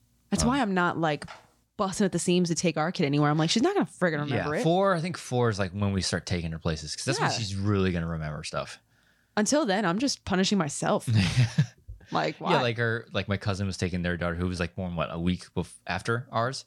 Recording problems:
none

